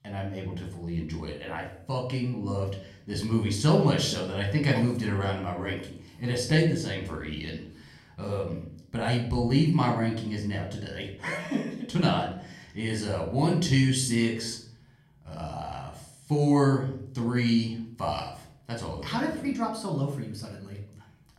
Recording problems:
room echo; slight; dies away in 0.5 s
off-mic speech; somewhat distant

